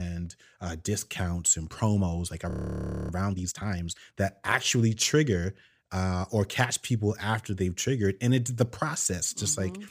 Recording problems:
abrupt cut into speech; at the start
audio freezing; at 2.5 s for 0.5 s

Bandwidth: 15 kHz